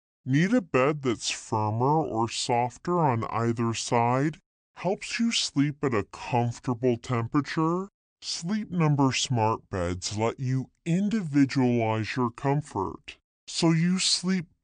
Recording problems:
wrong speed and pitch; too slow and too low; 0.6 times normal speed

